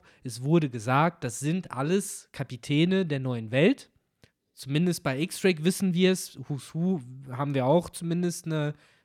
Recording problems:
none

